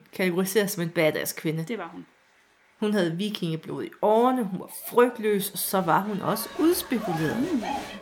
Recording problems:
crowd noise; noticeable; throughout; 10 dB below the speech

